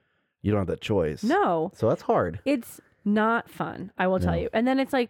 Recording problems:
muffled; slightly; fading above 3.5 kHz

